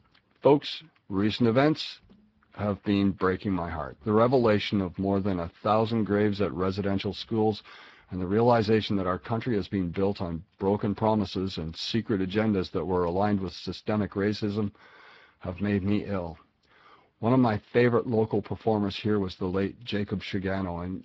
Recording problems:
garbled, watery; badly

